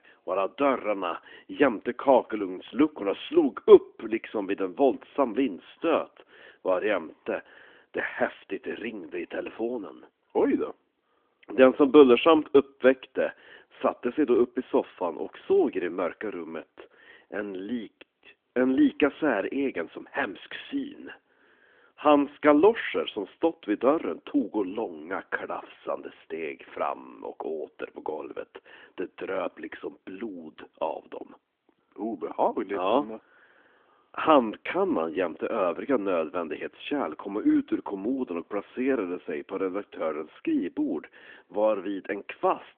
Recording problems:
phone-call audio; nothing above 3.5 kHz

